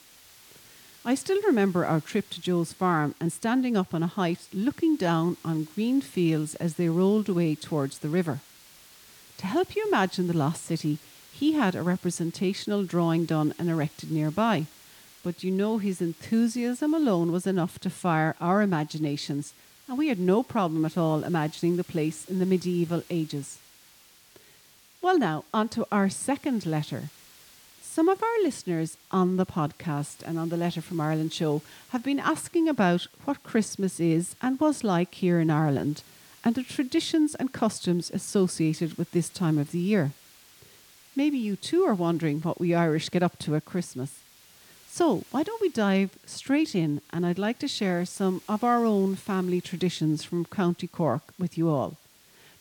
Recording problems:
hiss; faint; throughout; 25 dB below the speech

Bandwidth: 18.5 kHz